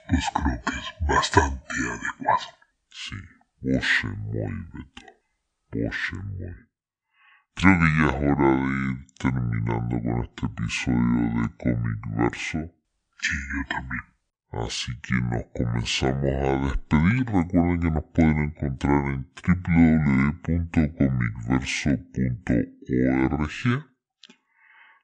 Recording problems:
wrong speed and pitch; too slow and too low; 0.6 times normal speed

